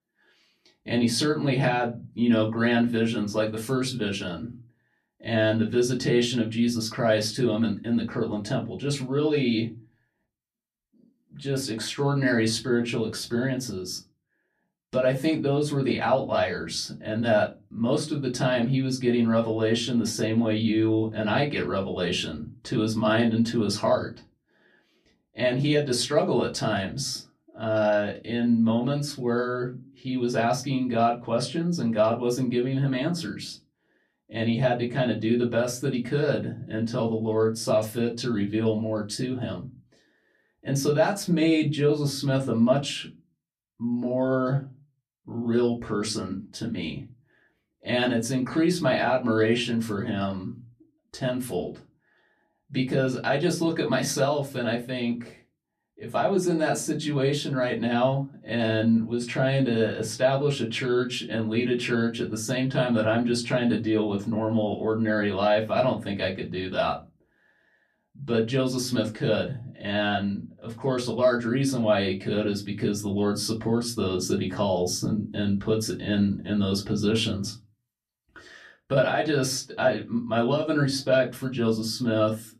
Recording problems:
off-mic speech; far
room echo; very slight; dies away in 0.2 s

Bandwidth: 14 kHz